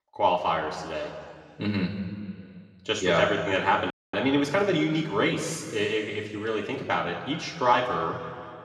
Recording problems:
room echo; noticeable; dies away in 2.3 s
off-mic speech; somewhat distant
audio freezing; at 4 s

